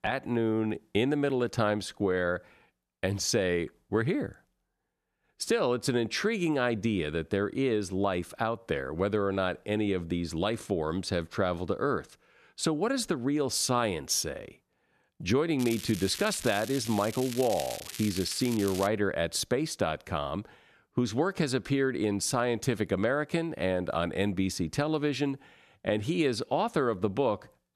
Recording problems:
crackling; noticeable; from 16 to 19 s; 10 dB below the speech

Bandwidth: 13.5 kHz